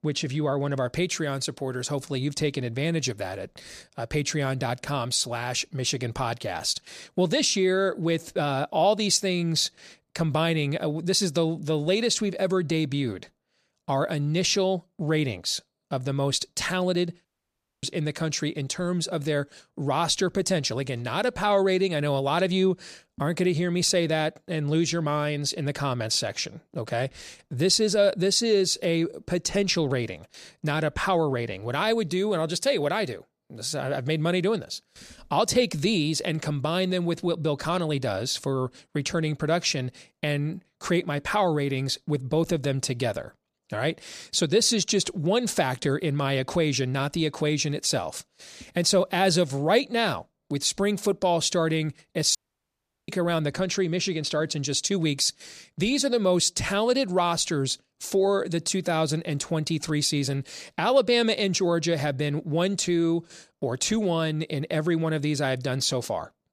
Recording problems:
audio cutting out; at 17 s for 0.5 s and at 52 s for 0.5 s

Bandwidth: 14.5 kHz